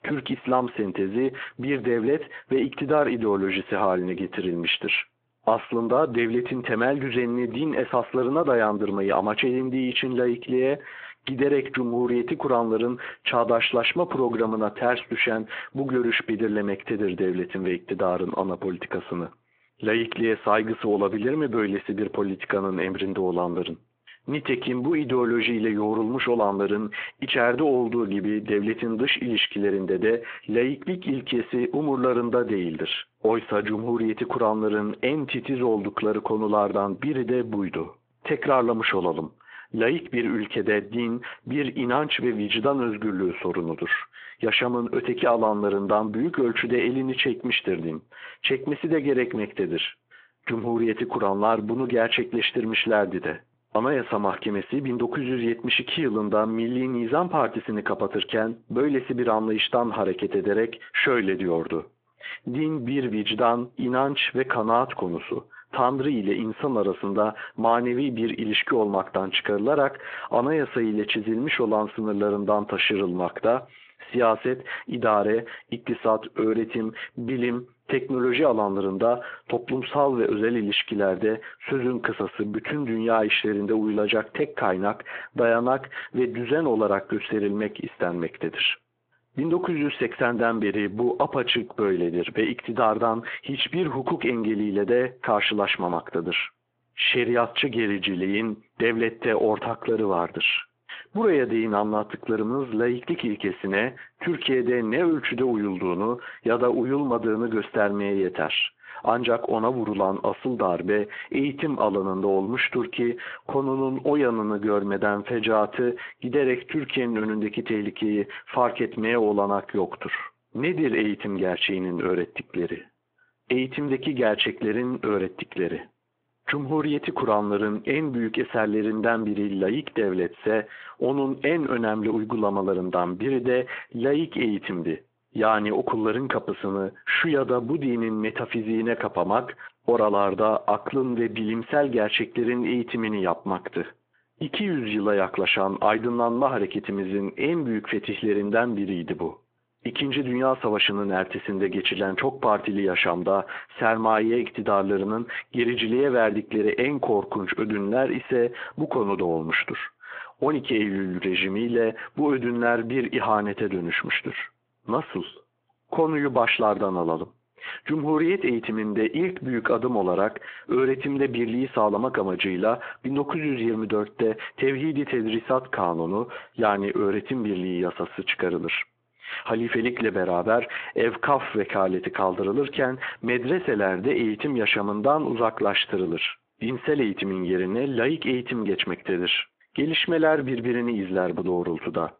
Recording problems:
squashed, flat; heavily
phone-call audio

